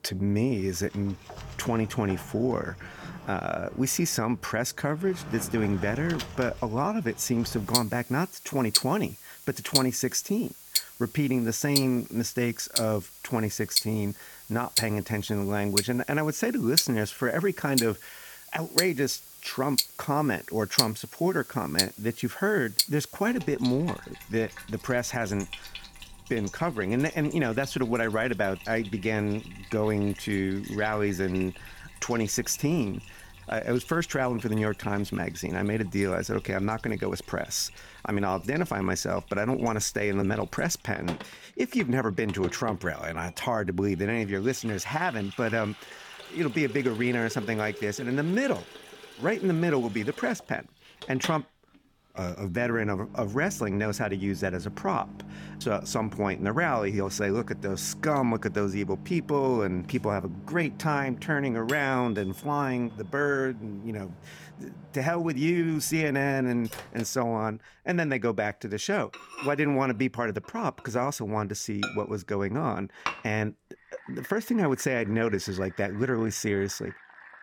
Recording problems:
household noises; loud; throughout; 6 dB below the speech

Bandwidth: 17.5 kHz